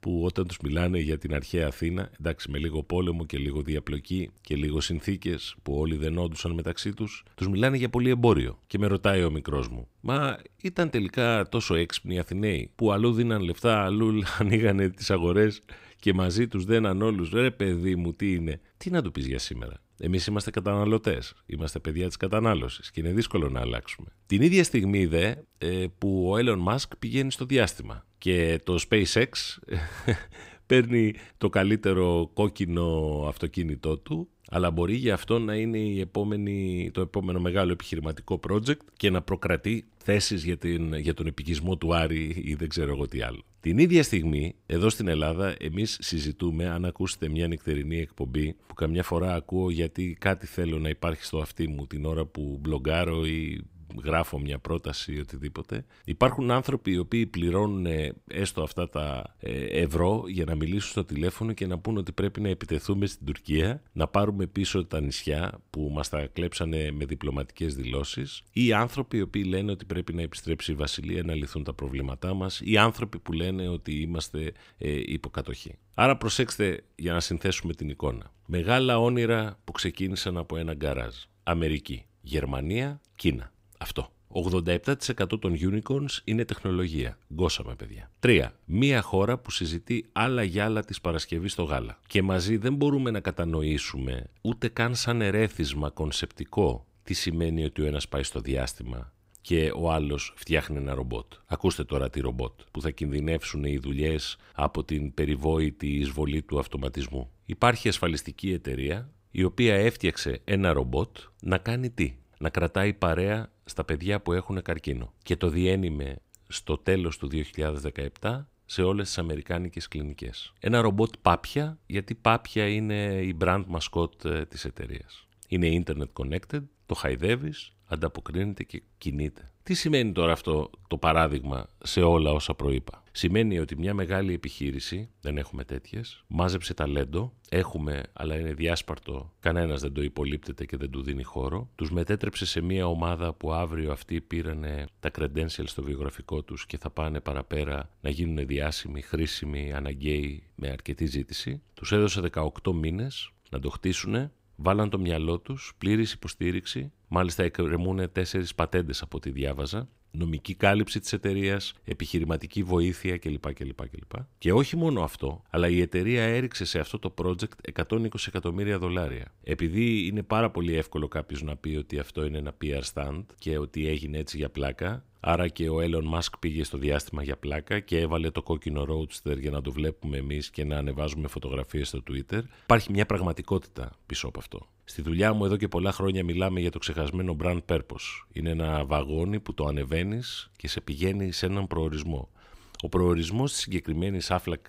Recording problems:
none

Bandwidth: 15.5 kHz